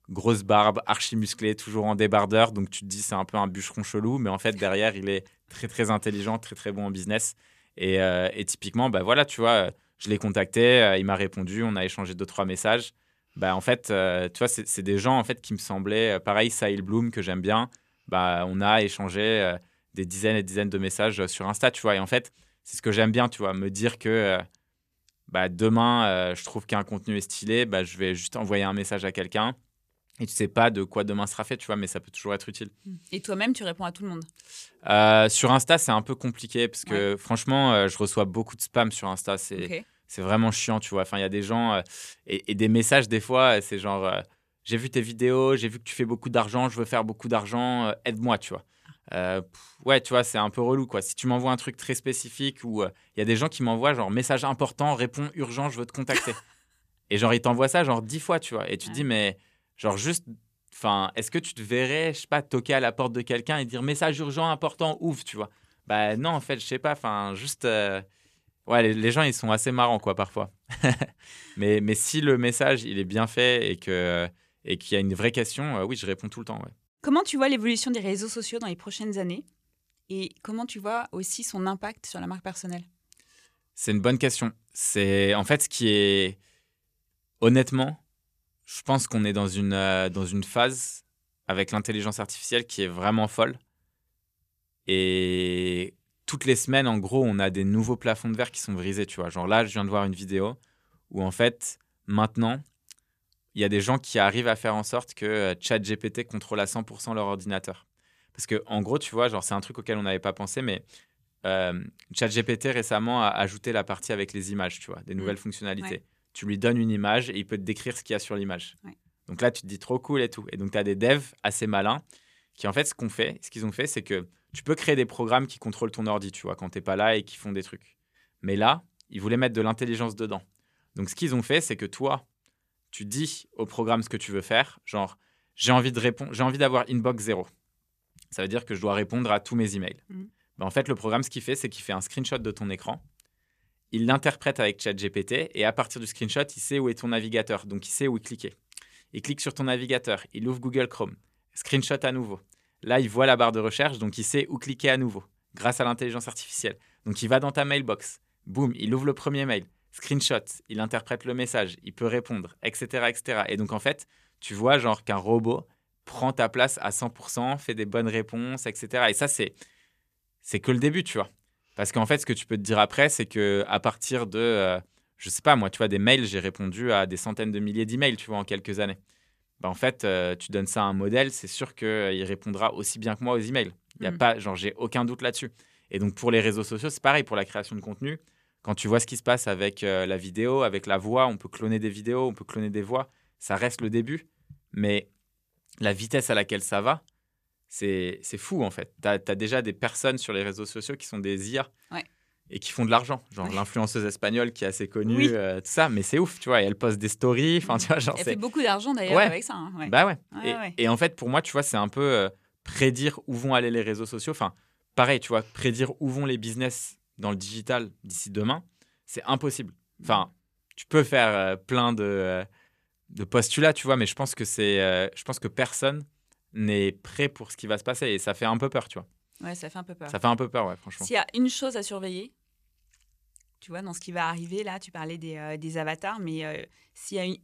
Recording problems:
none

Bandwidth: 14.5 kHz